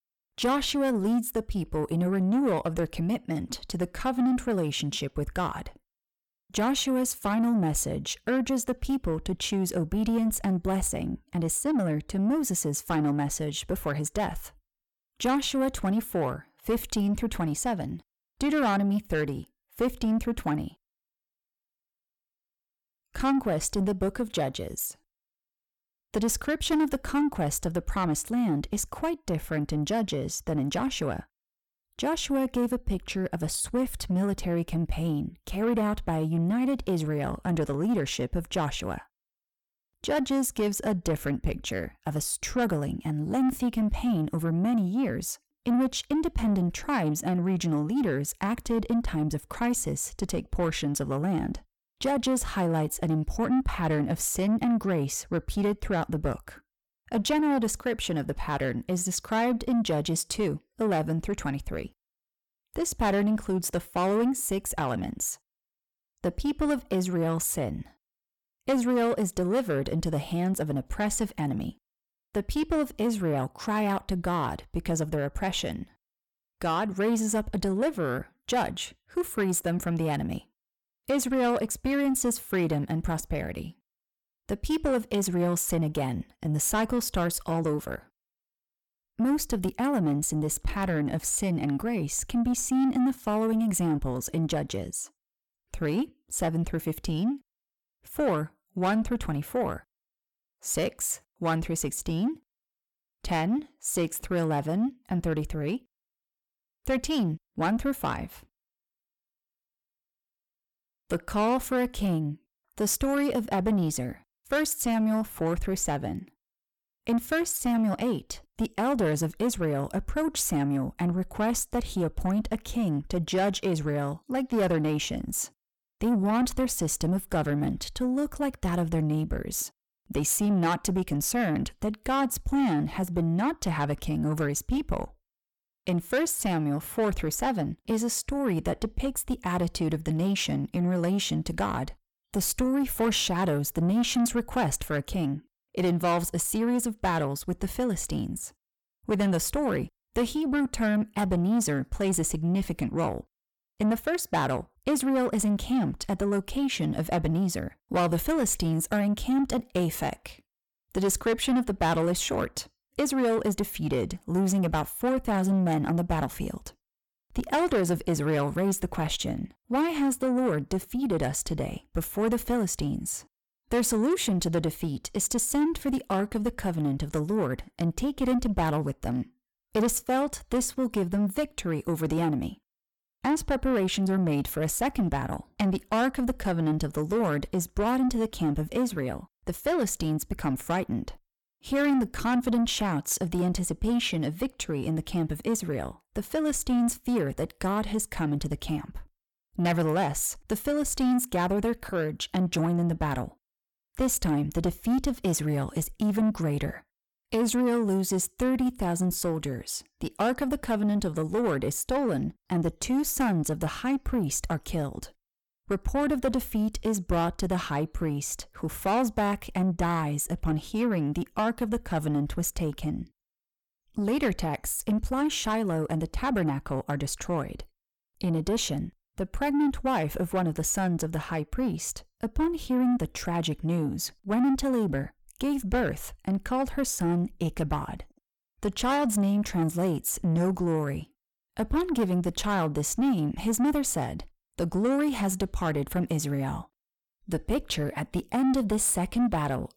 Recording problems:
distortion; slight; 10 dB below the speech

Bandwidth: 17.5 kHz